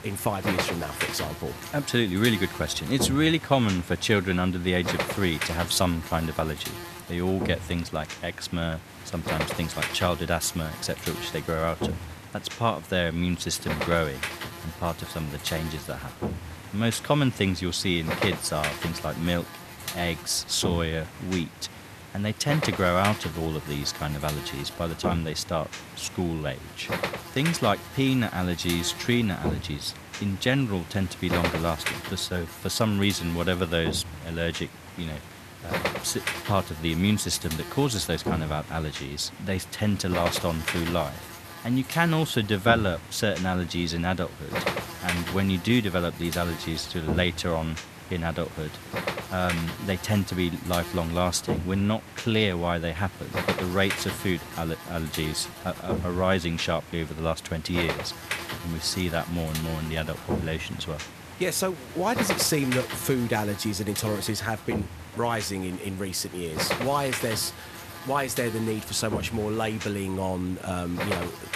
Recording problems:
electrical hum; loud; throughout; 50 Hz, 6 dB below the speech

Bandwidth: 14 kHz